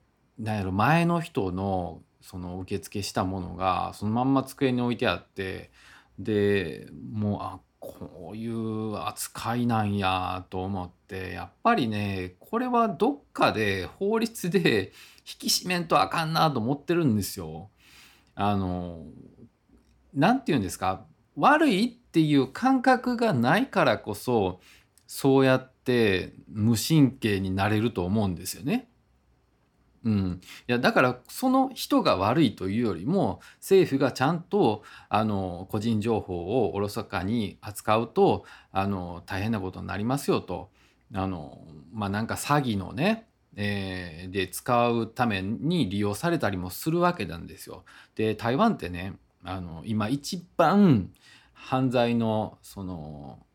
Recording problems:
none

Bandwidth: 18 kHz